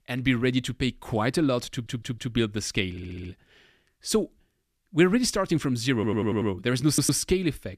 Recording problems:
audio stuttering; 4 times, first at 1.5 s

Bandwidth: 14.5 kHz